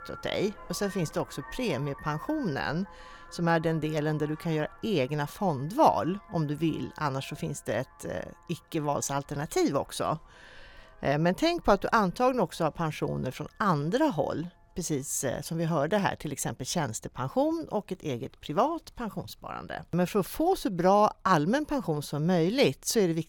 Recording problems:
traffic noise; faint; throughout; 20 dB below the speech

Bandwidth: 18 kHz